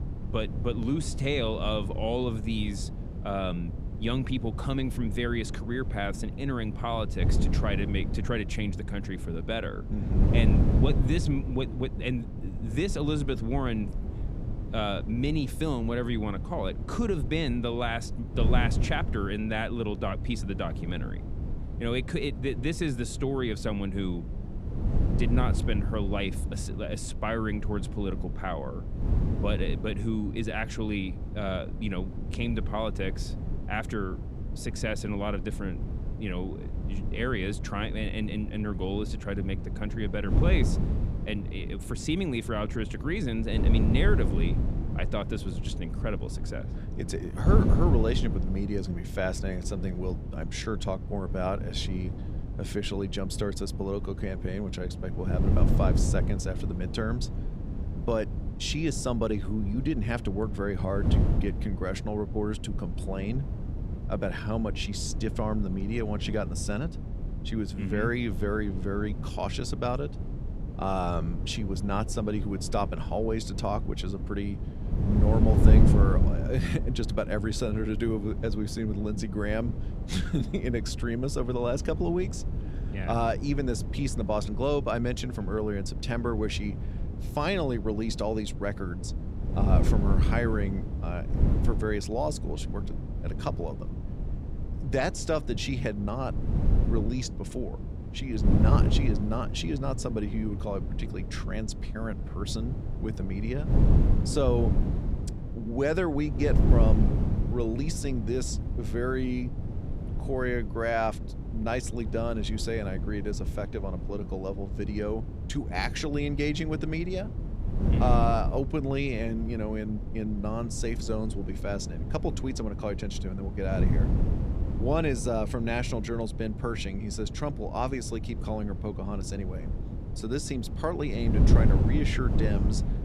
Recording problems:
wind noise on the microphone; heavy; 9 dB below the speech

